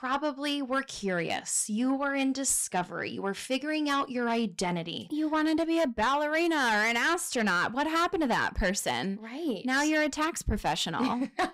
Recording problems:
distortion; slight; 10 dB below the speech

